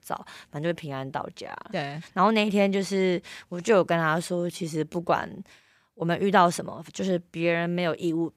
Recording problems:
uneven, jittery; strongly; from 0.5 to 7.5 s

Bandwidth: 15 kHz